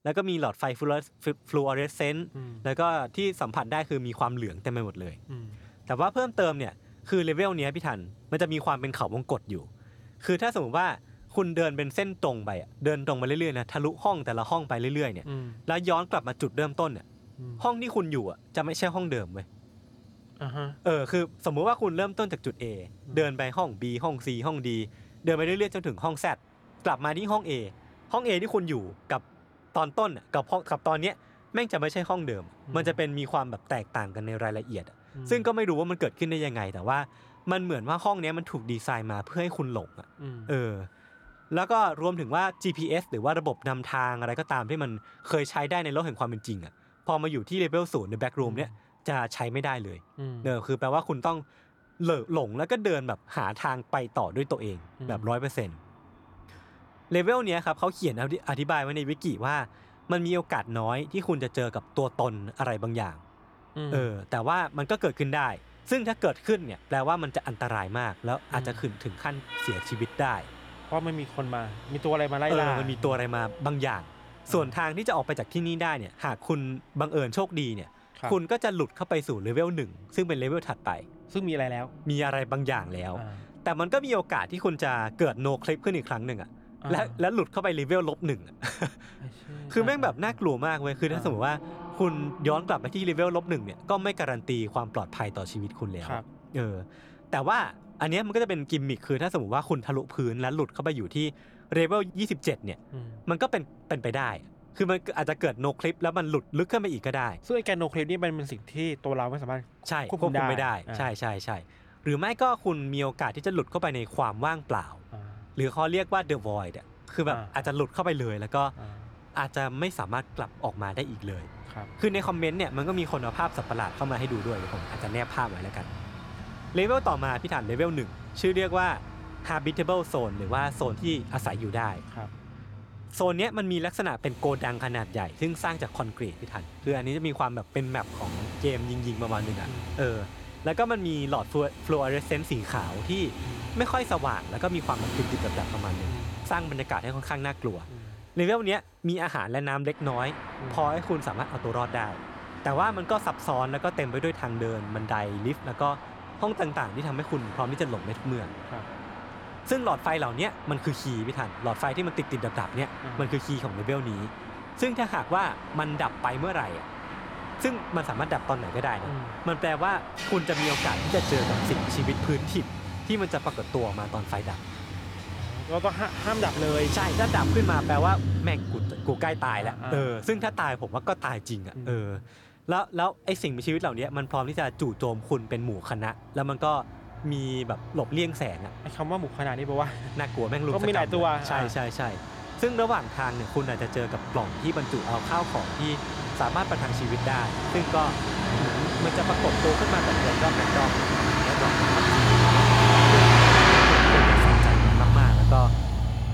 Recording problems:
traffic noise; very loud; throughout; 1 dB above the speech

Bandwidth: 18 kHz